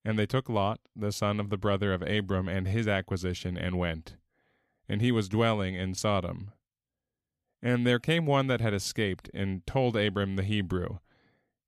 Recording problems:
none

